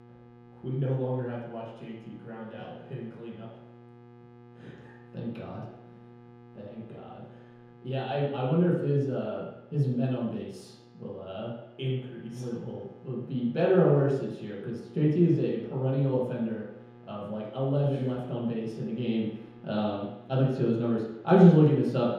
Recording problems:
room echo; strong; dies away in 0.9 s
off-mic speech; far
electrical hum; faint; throughout; 60 Hz, 25 dB below the speech

